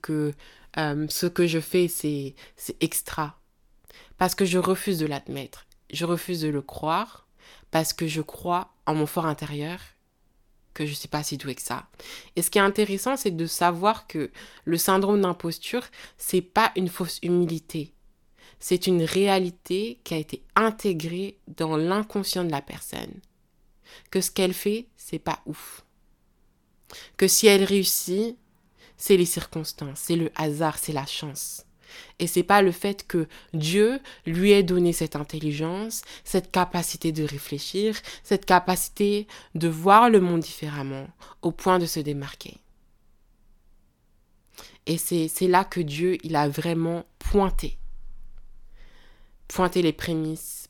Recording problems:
none

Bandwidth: 18 kHz